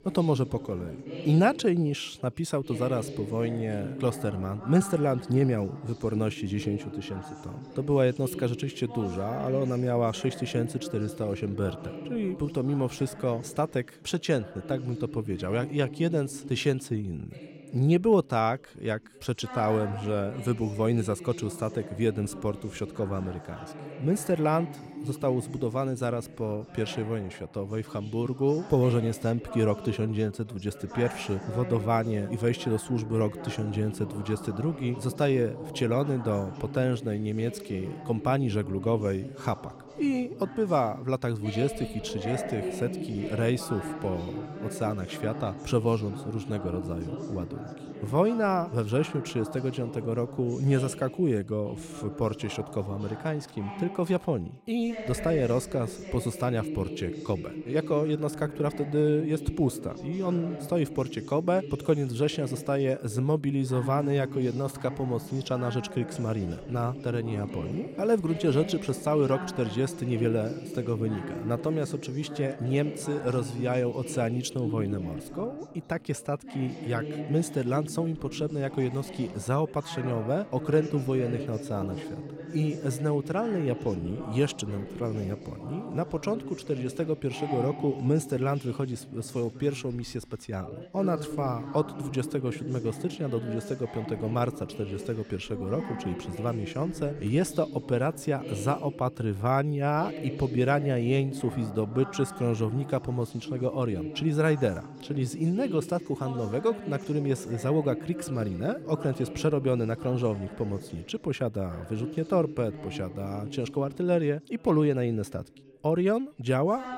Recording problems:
background chatter; noticeable; throughout; 3 voices, 10 dB below the speech

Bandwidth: 16 kHz